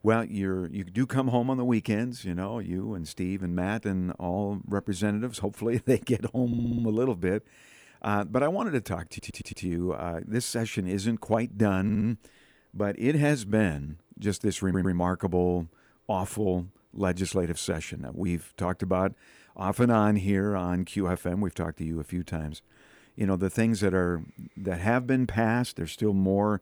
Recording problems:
audio stuttering; 4 times, first at 6.5 s

